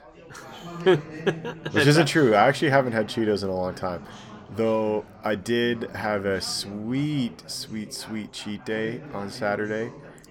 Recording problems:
background chatter; noticeable; throughout; 4 voices, 15 dB below the speech

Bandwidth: 17.5 kHz